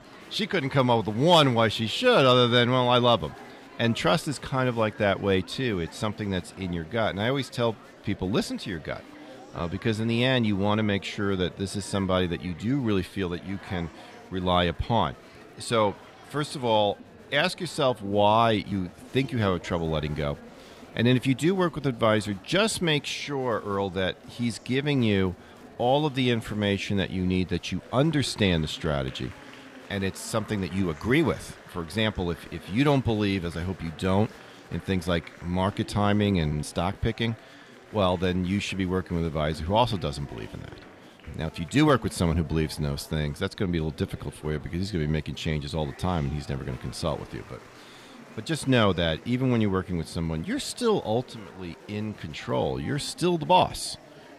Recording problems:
murmuring crowd; faint; throughout; 20 dB below the speech

